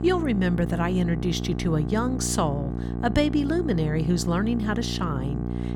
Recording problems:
electrical hum; loud; throughout; 60 Hz, 9 dB below the speech

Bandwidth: 17 kHz